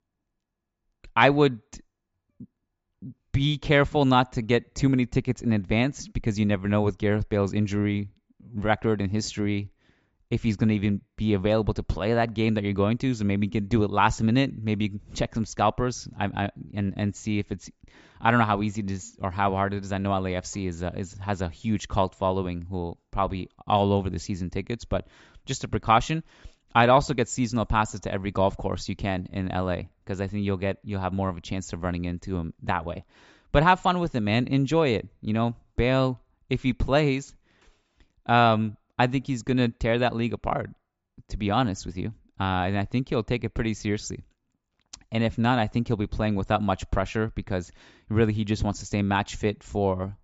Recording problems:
high frequencies cut off; noticeable; nothing above 8 kHz

